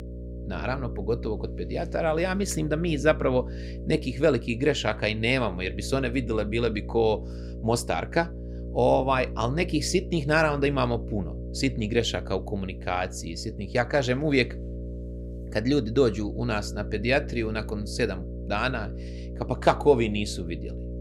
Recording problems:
electrical hum; noticeable; throughout; 60 Hz, 15 dB below the speech

